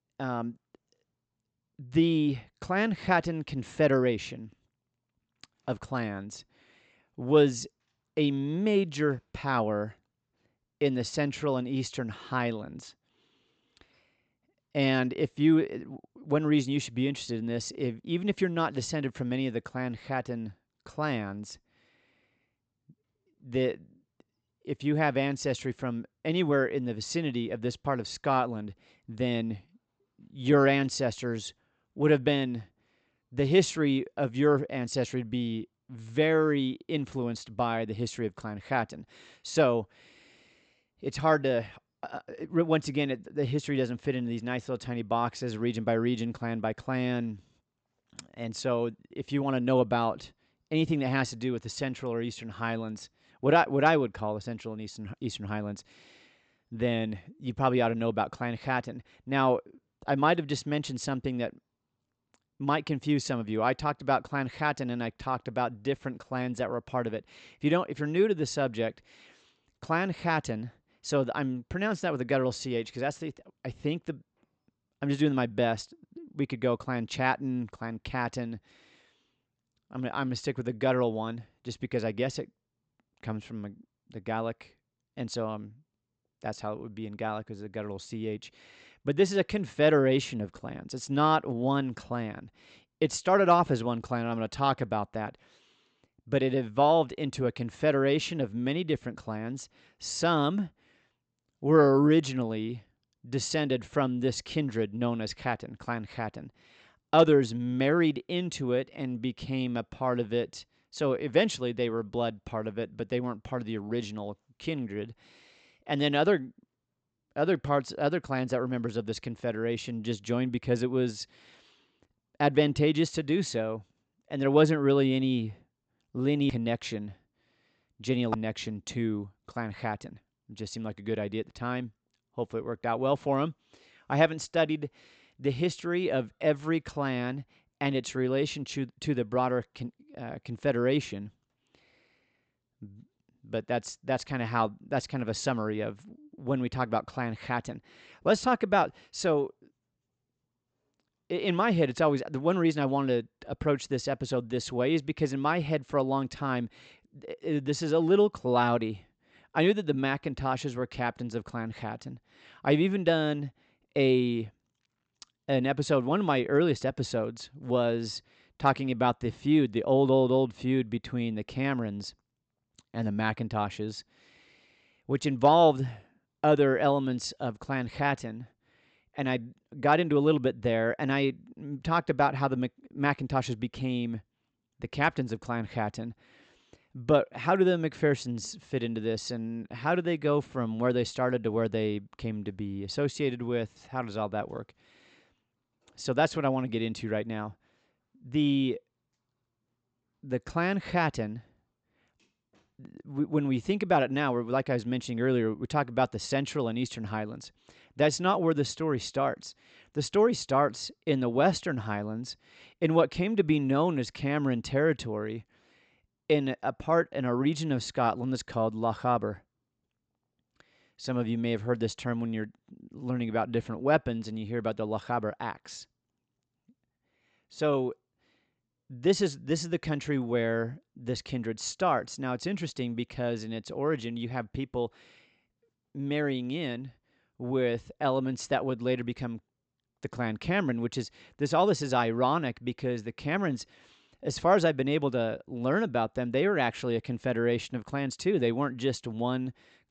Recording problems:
high frequencies cut off; noticeable; nothing above 8 kHz

